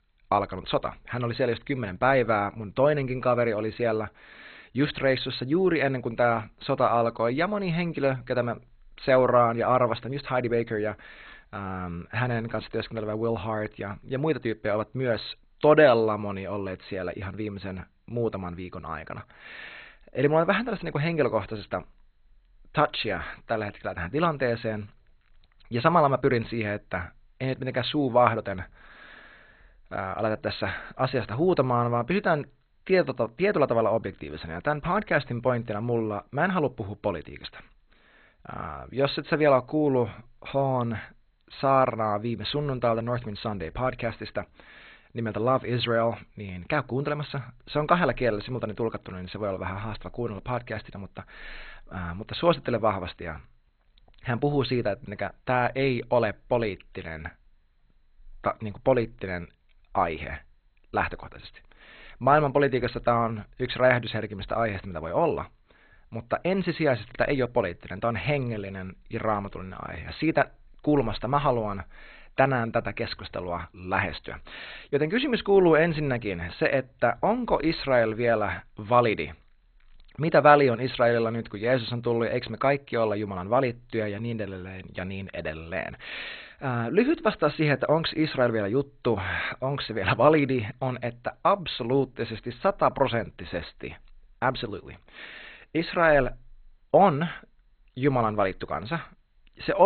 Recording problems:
garbled, watery; badly; nothing above 4 kHz
abrupt cut into speech; at the end

